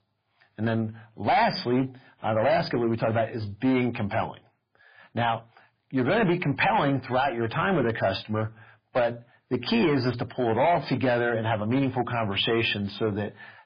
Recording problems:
garbled, watery; badly; nothing above 5 kHz
distortion; slight; 8% of the sound clipped

